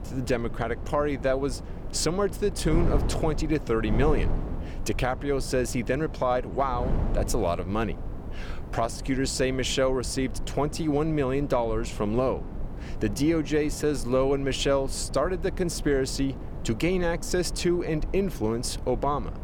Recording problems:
wind noise on the microphone; occasional gusts; 15 dB below the speech

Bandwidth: 18 kHz